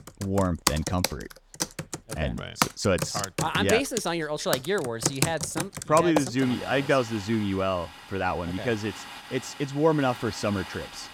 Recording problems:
household noises; loud; throughout; 5 dB below the speech

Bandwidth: 17 kHz